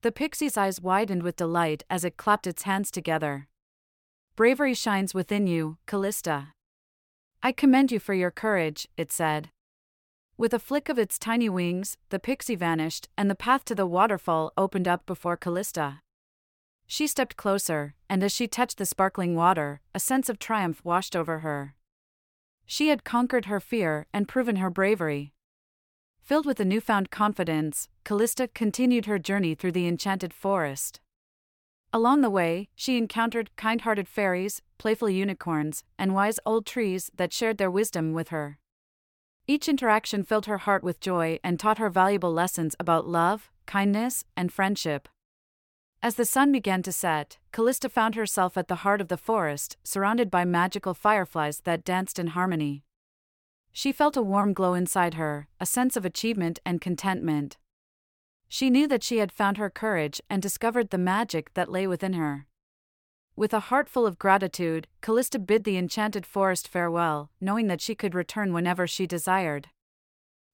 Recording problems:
none

